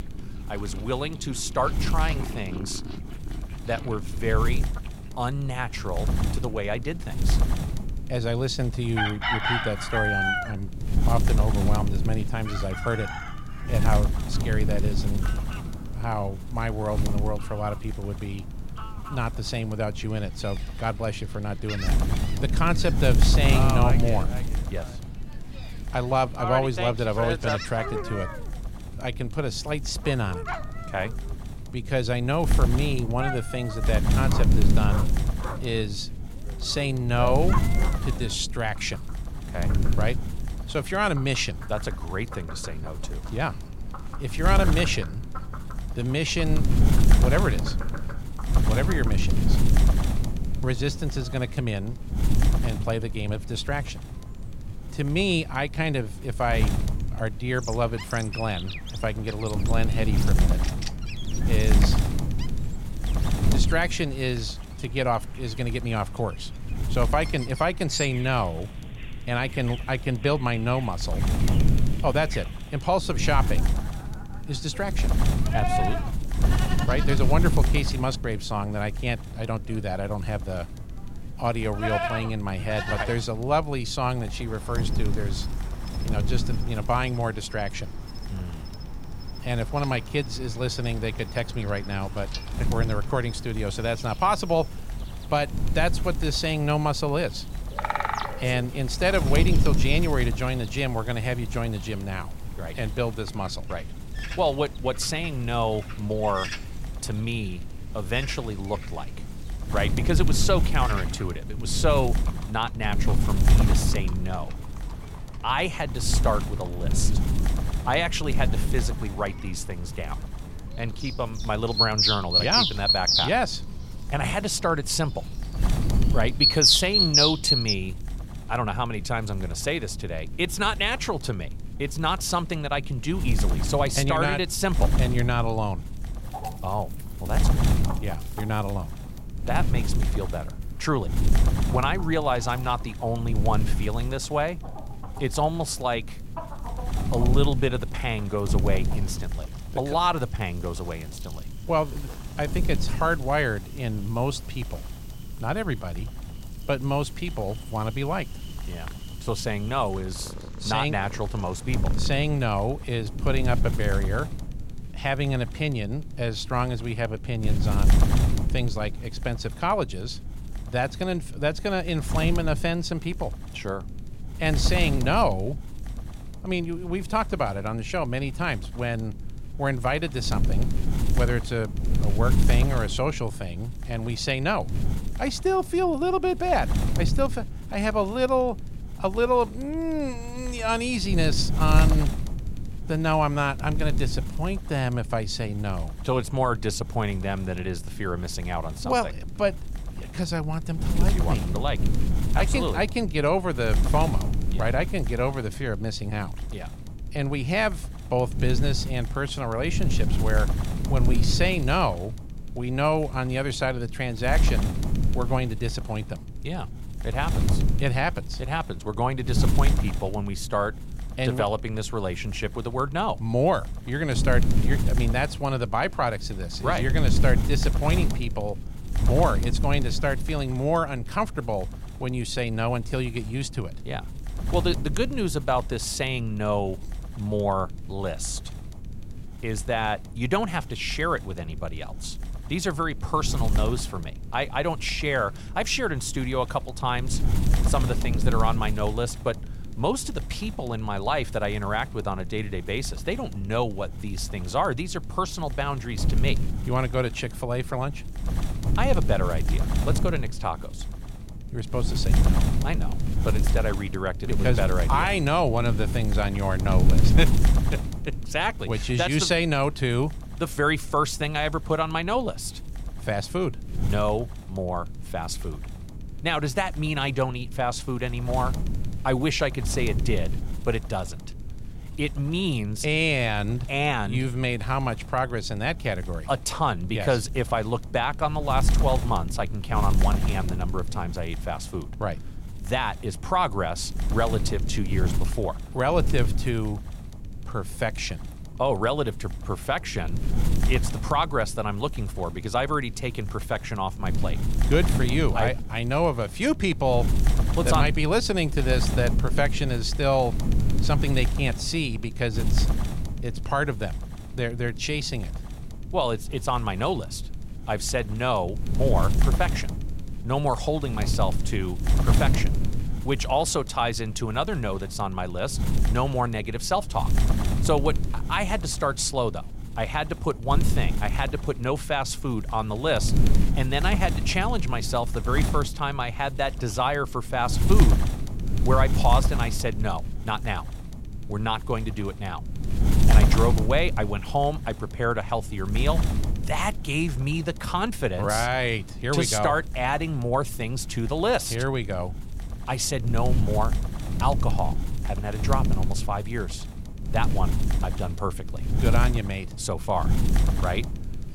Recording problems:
animal sounds; loud; until 2:42; 2 dB below the speech
wind noise on the microphone; occasional gusts; 10 dB below the speech

